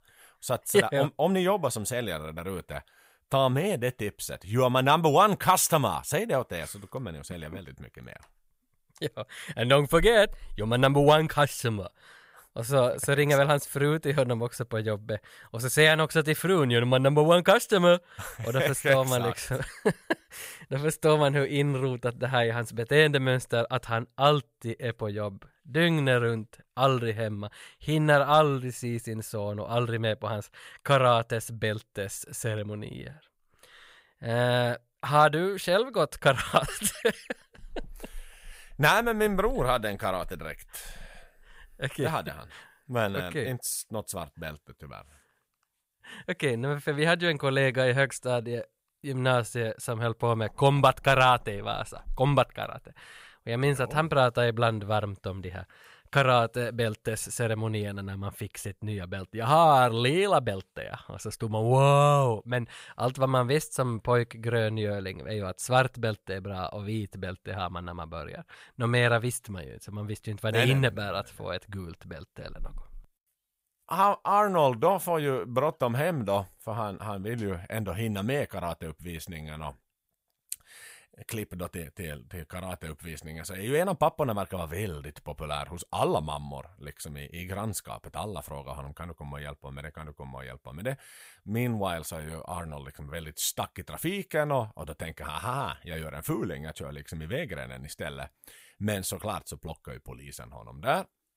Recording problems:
none

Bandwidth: 15.5 kHz